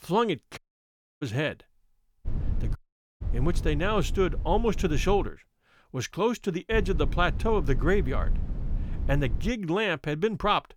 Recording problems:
low rumble; noticeable; from 2.5 to 5.5 s and from 6.5 to 9.5 s; 20 dB below the speech
audio cutting out; at 0.5 s for 0.5 s and at 3 s

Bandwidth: 18.5 kHz